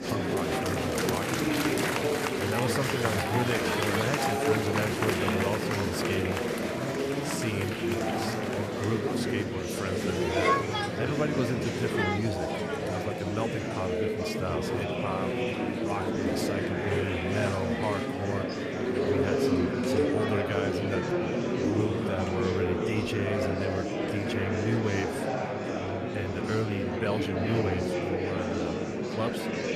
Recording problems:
murmuring crowd; very loud; throughout; 4 dB above the speech

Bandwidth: 14.5 kHz